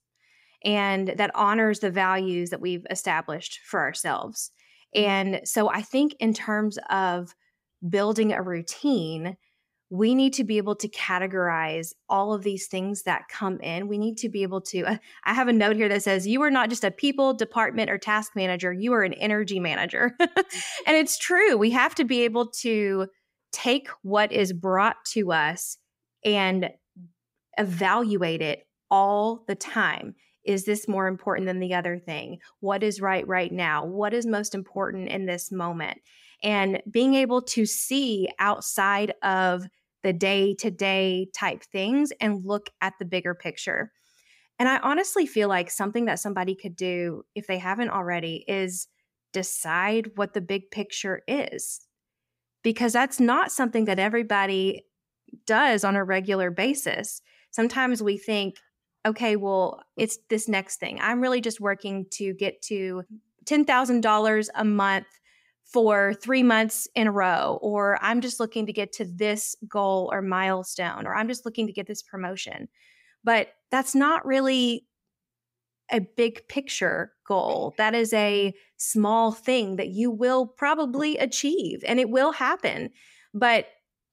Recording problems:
none

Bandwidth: 15.5 kHz